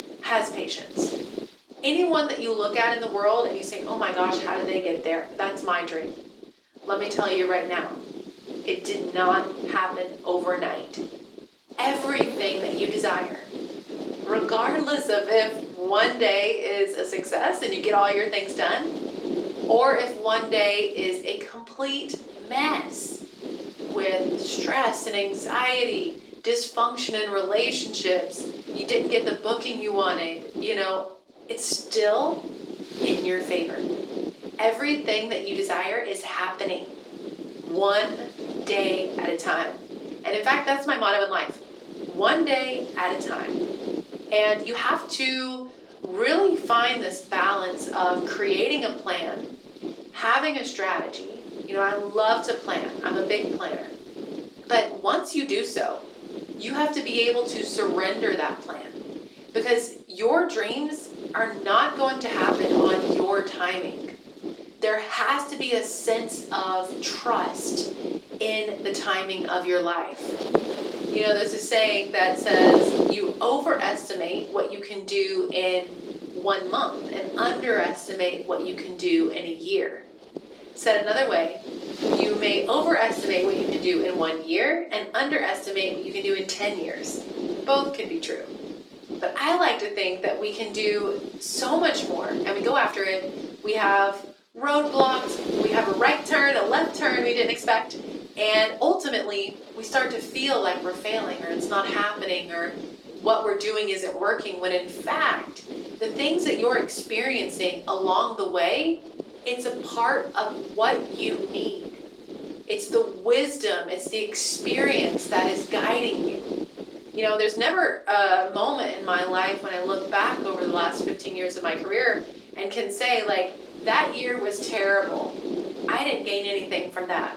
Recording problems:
off-mic speech; far
thin; somewhat; fading below 350 Hz
room echo; slight; dies away in 0.4 s
garbled, watery; slightly; nothing above 16.5 kHz
wind noise on the microphone; occasional gusts; 10 dB below the speech
uneven, jittery; strongly; from 4 s to 2:05

